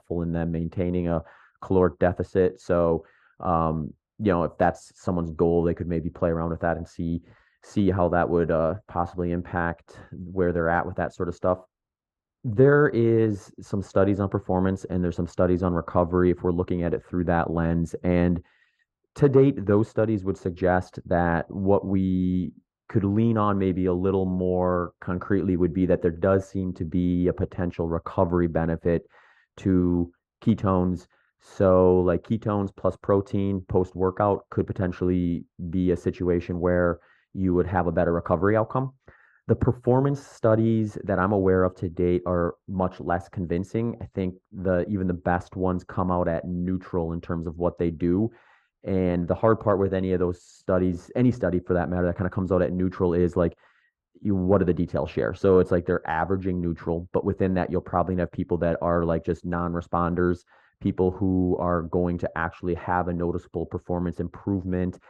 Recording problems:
muffled; very; fading above 2 kHz

